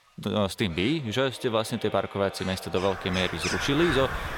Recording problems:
echo of what is said; noticeable; throughout; 300 ms later, 15 dB below the speech
animal sounds; loud; throughout; 6 dB below the speech

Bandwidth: 17 kHz